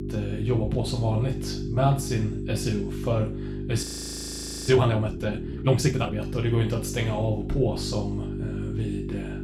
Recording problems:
room echo; slight; dies away in 0.4 s
off-mic speech; somewhat distant
electrical hum; loud; throughout; 50 Hz, 9 dB below the speech
audio freezing; at 4 s for 1 s

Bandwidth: 16.5 kHz